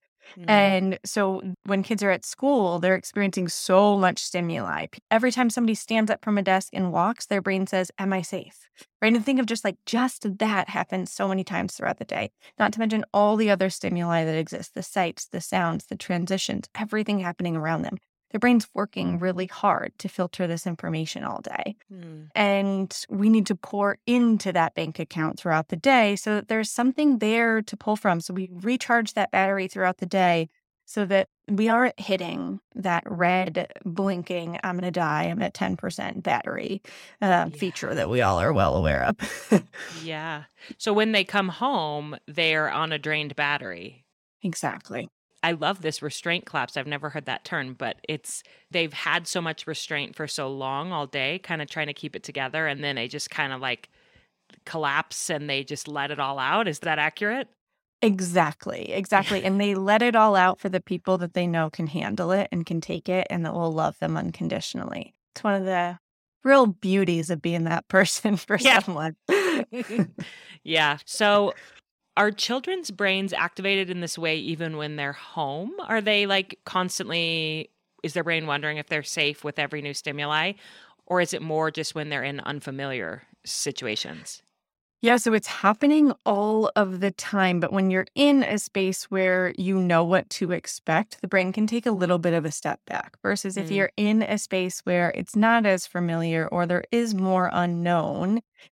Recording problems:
none

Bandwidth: 16.5 kHz